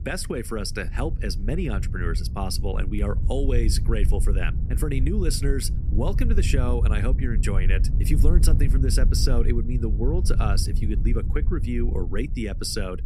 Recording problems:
low rumble; noticeable; throughout; 10 dB below the speech

